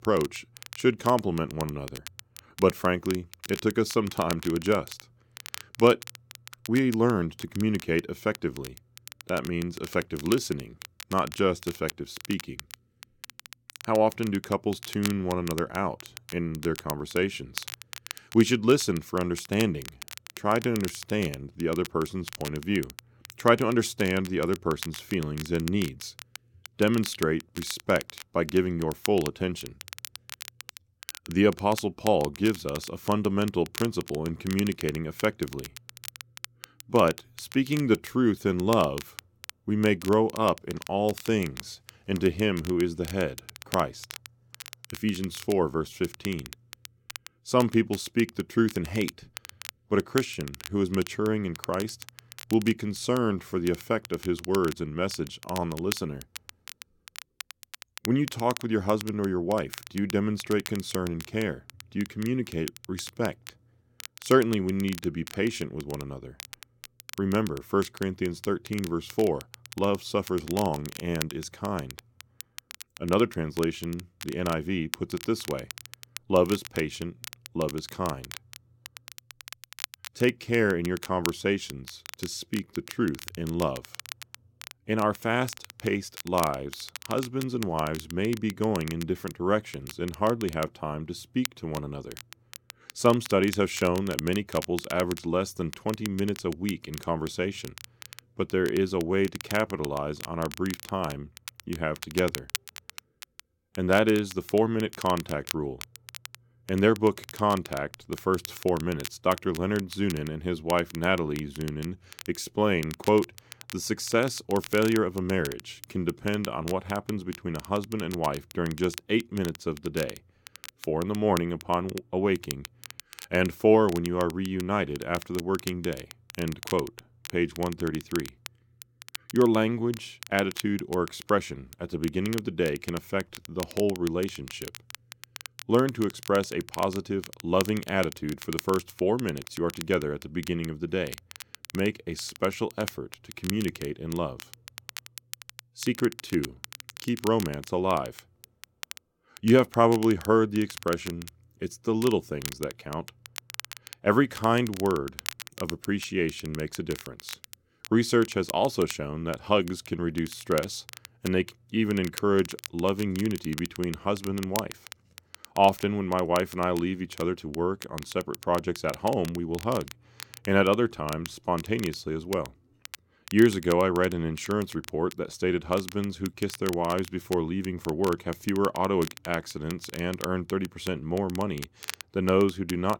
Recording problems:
crackle, like an old record; noticeable; 15 dB below the speech

